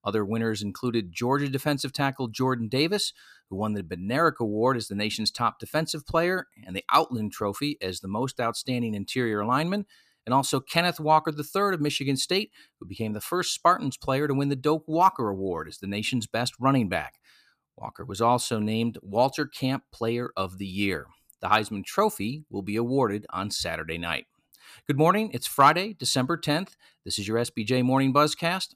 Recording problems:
none

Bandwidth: 14.5 kHz